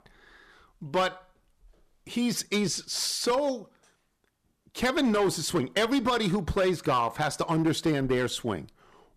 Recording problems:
distortion; slight; 6% of the sound clipped

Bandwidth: 14.5 kHz